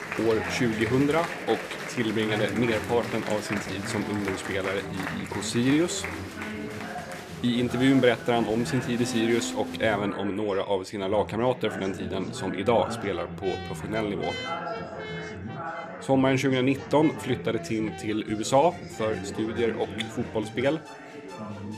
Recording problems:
chatter from many people; loud; throughout; 9 dB below the speech
background music; noticeable; from 9 s on; 15 dB below the speech

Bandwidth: 14.5 kHz